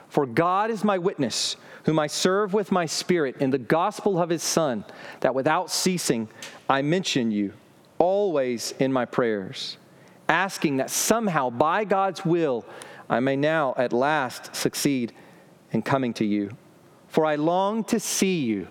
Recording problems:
squashed, flat; heavily

